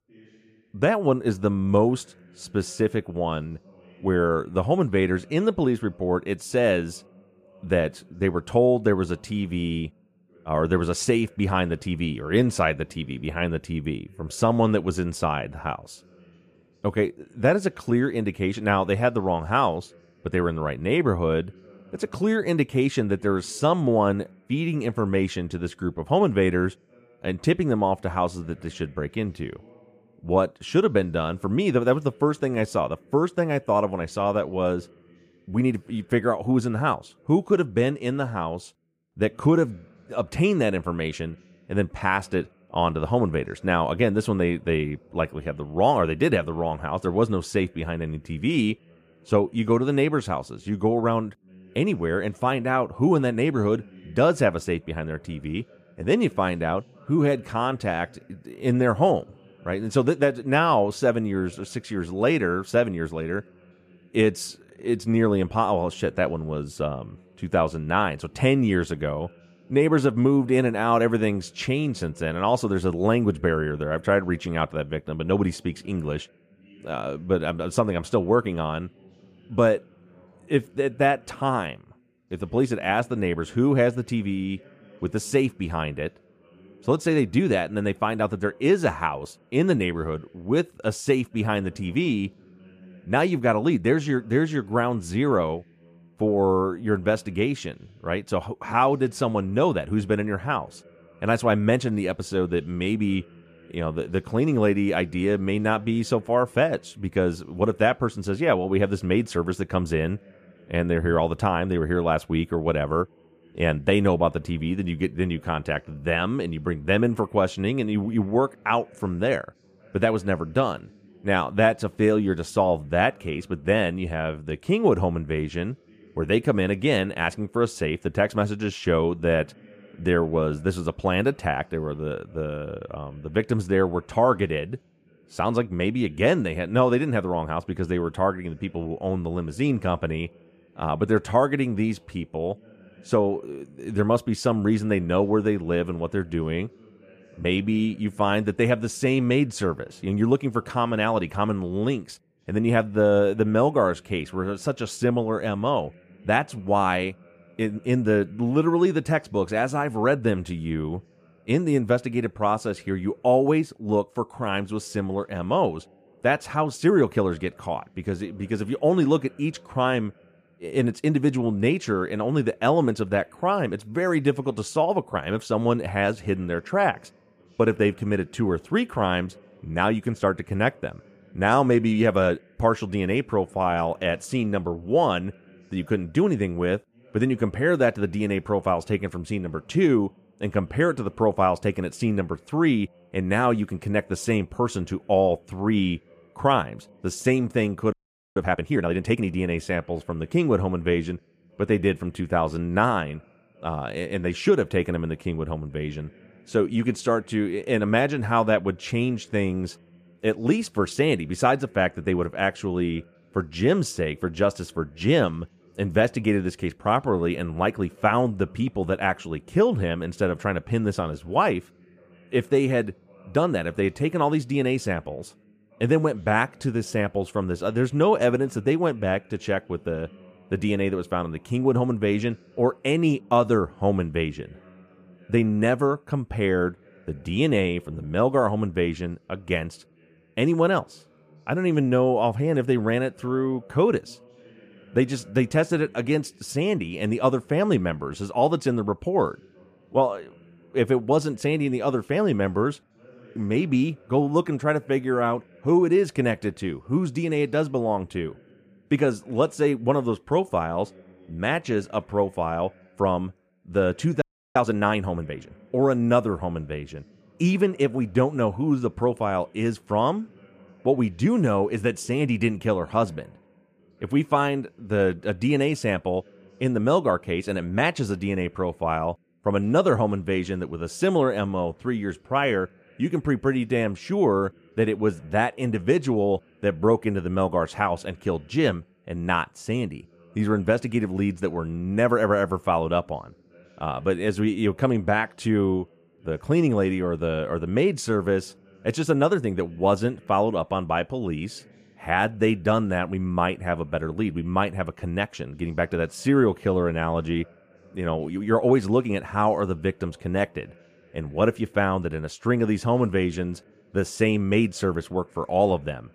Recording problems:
voice in the background; faint; throughout; 30 dB below the speech
audio freezing; at 3:18 and at 4:24

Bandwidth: 14.5 kHz